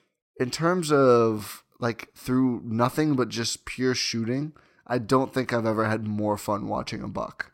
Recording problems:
none

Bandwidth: 16 kHz